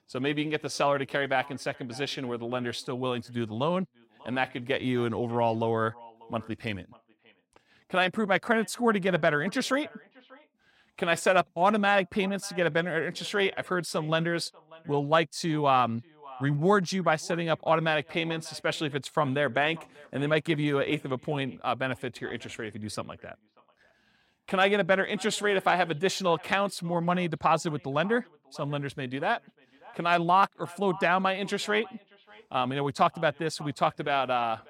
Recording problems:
echo of what is said; faint; throughout; 590 ms later, 25 dB below the speech

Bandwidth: 16.5 kHz